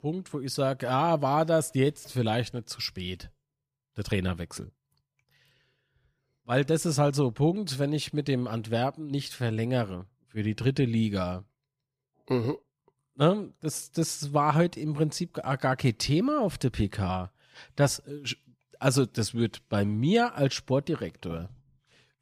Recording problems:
none

